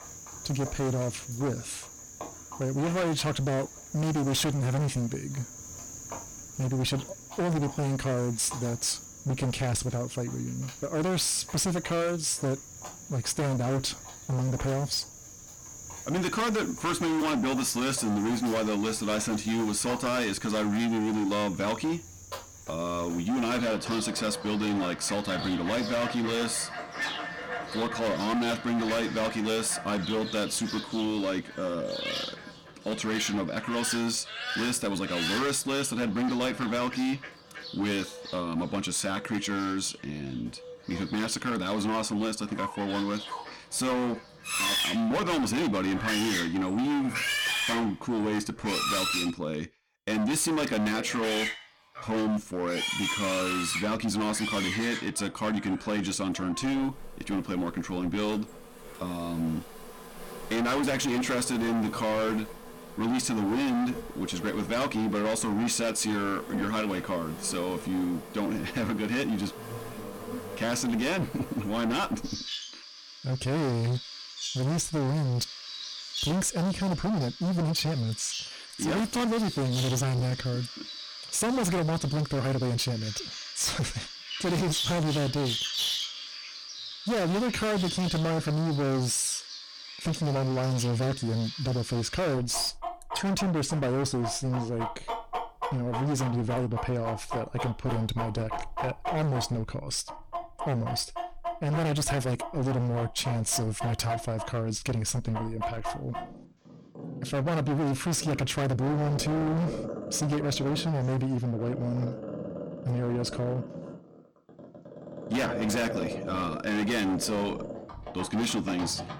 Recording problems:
distortion; heavy; 23% of the sound clipped
animal sounds; loud; throughout; 8 dB below the speech

